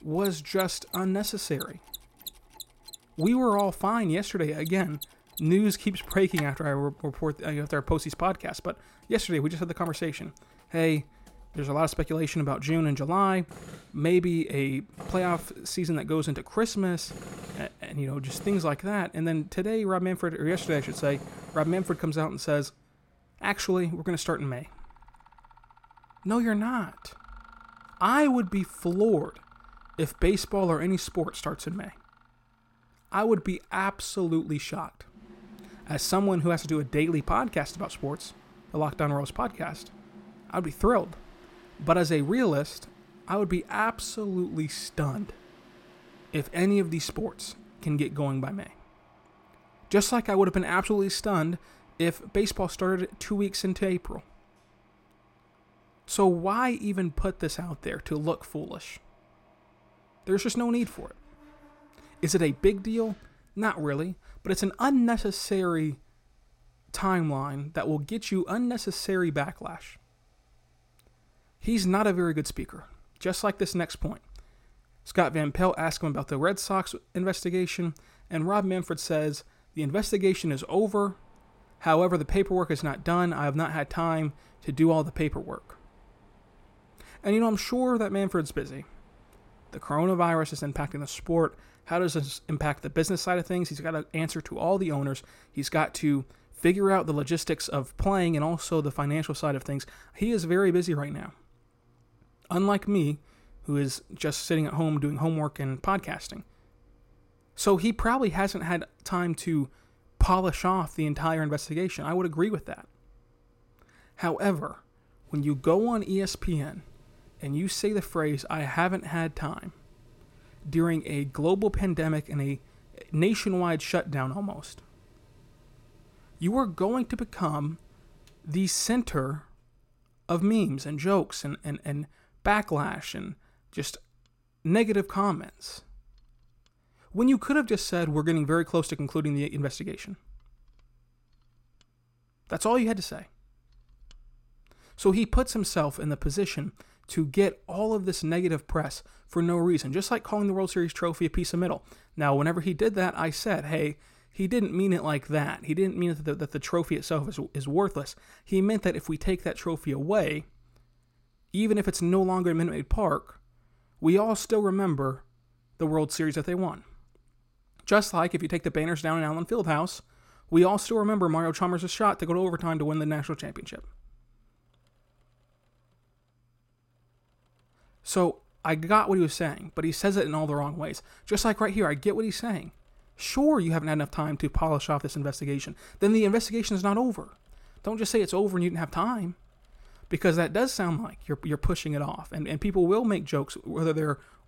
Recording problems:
machinery noise; faint; throughout; 20 dB below the speech

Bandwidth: 16.5 kHz